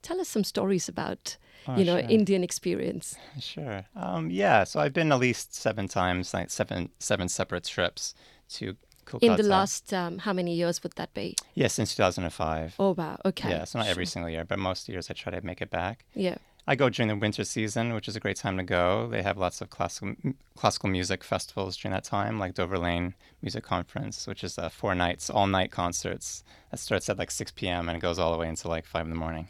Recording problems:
none

